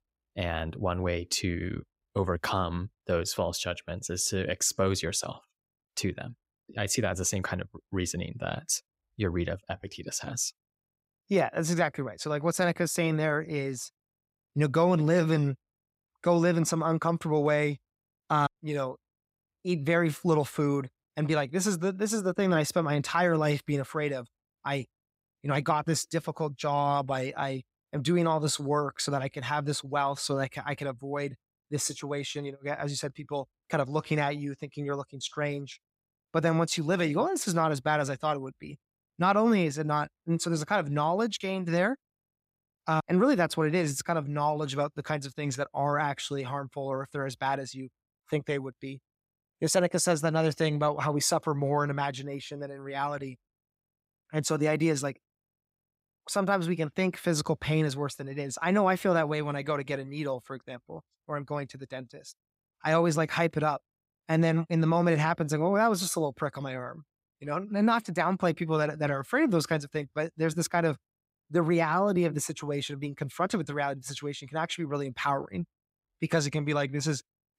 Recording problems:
none

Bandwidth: 15.5 kHz